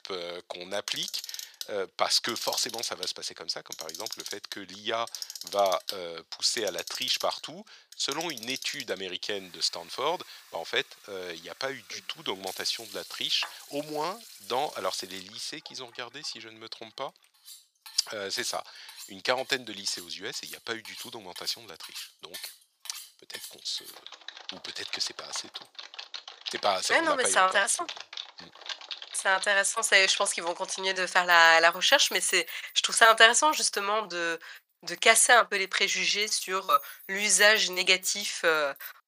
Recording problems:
thin; very; fading below 900 Hz
household noises; noticeable; throughout; 15 dB below the speech

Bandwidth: 15 kHz